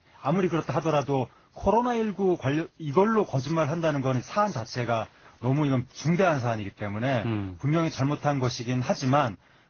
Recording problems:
garbled, watery; badly; nothing above 6.5 kHz

